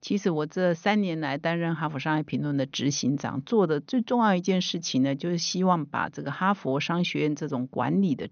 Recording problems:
high frequencies cut off; noticeable; nothing above 6.5 kHz

